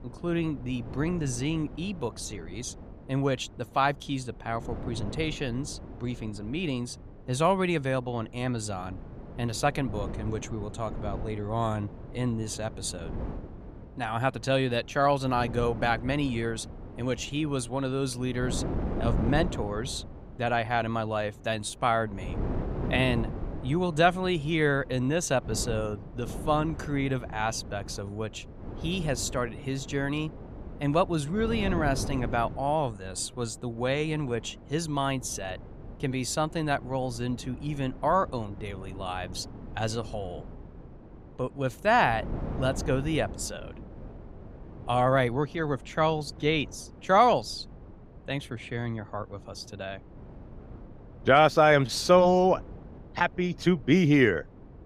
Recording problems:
wind noise on the microphone; occasional gusts; 20 dB below the speech

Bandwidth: 15.5 kHz